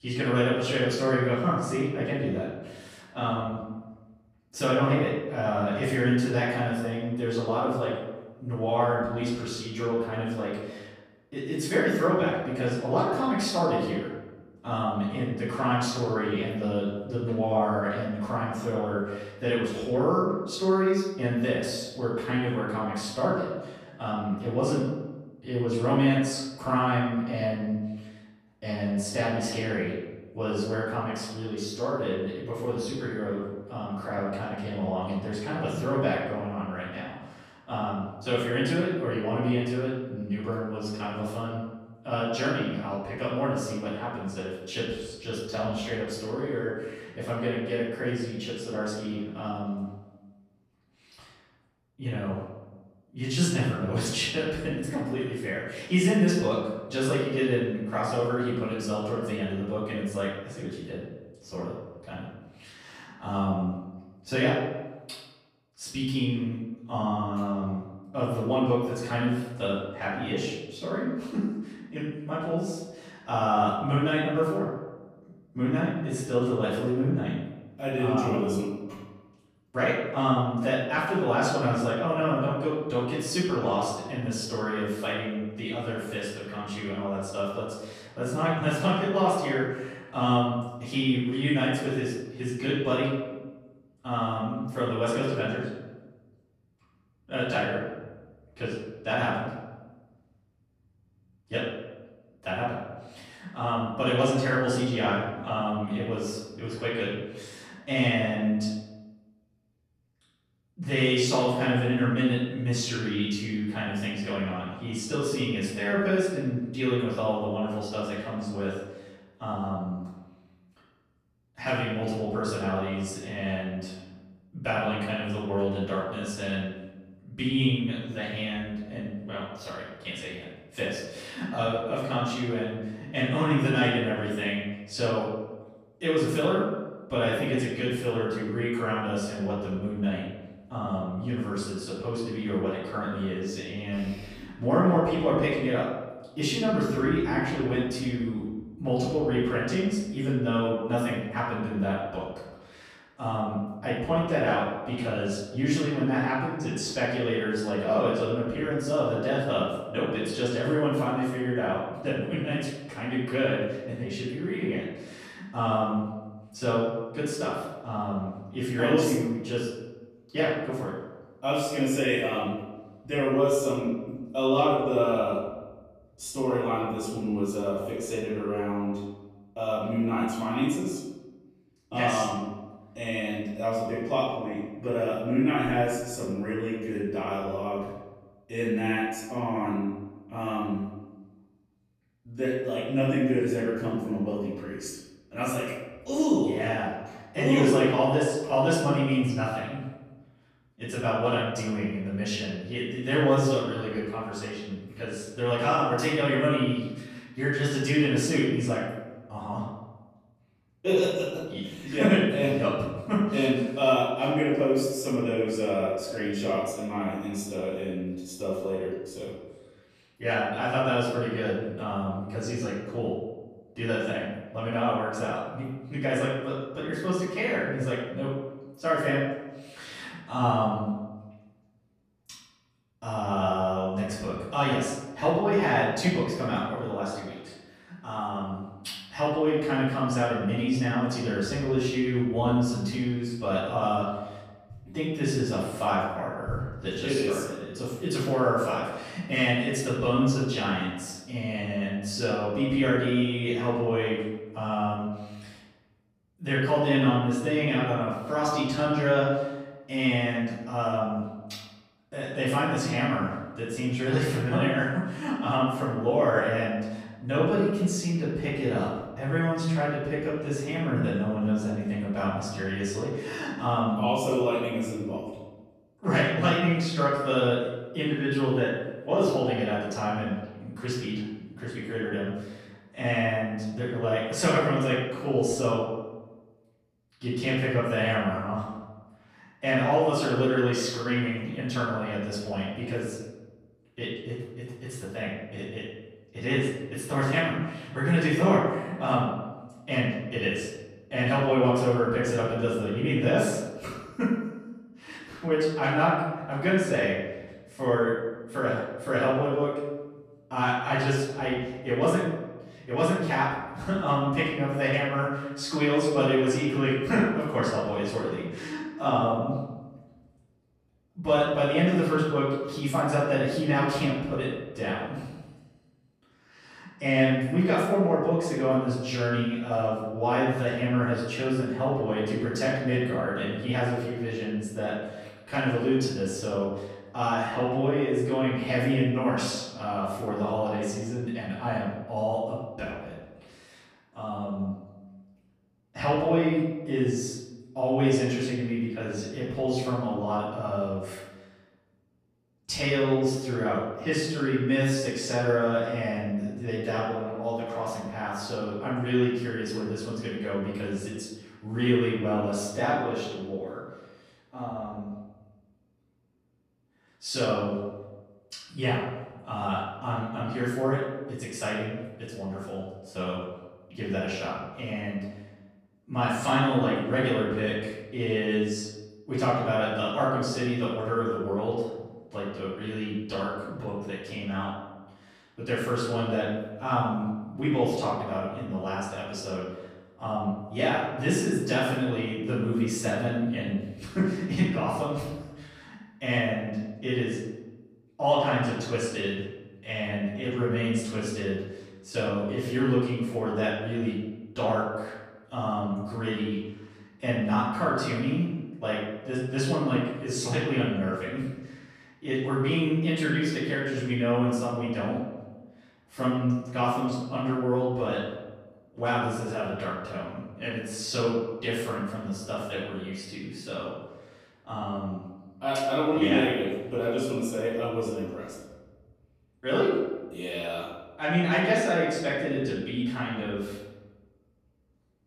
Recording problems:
off-mic speech; far
room echo; noticeable; dies away in 1 s

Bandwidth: 14.5 kHz